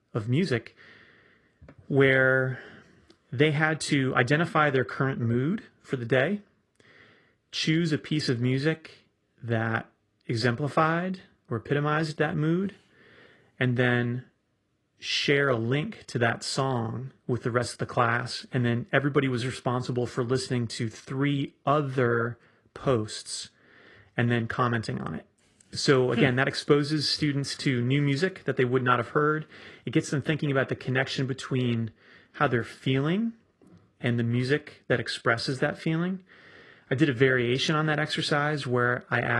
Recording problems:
garbled, watery; slightly
abrupt cut into speech; at the end

